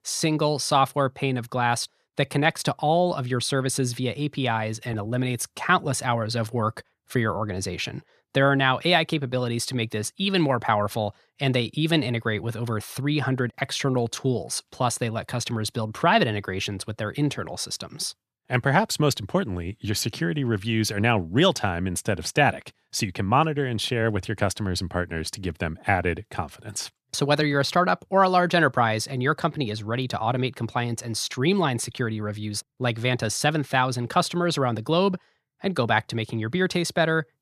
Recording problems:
none

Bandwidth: 14.5 kHz